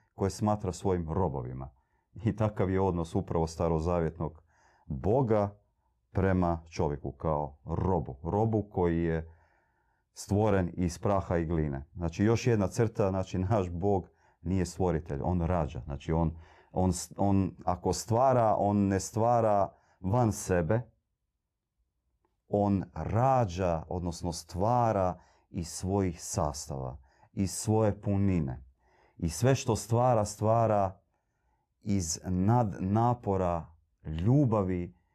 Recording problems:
none

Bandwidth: 14 kHz